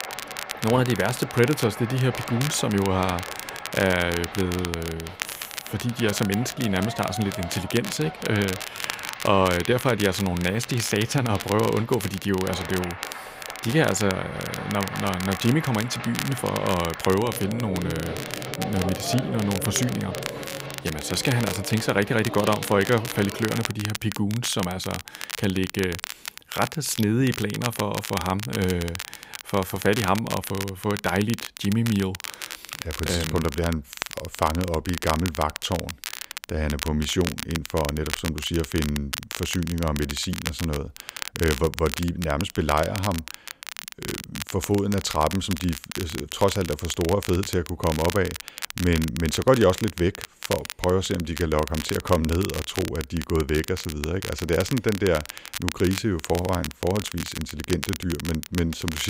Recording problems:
crackle, like an old record; loud; 9 dB below the speech
crowd noise; noticeable; until 24 s; 10 dB below the speech
abrupt cut into speech; at the end

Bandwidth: 15.5 kHz